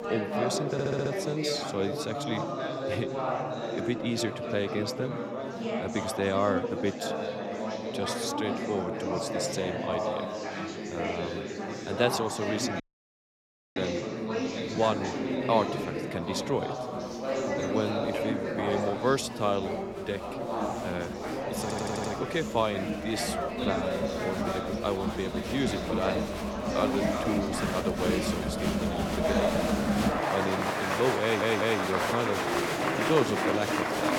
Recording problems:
chatter from many people; very loud; throughout; 1 dB above the speech
audio stuttering; at 0.5 s, at 22 s and at 31 s
audio cutting out; at 13 s for 1 s

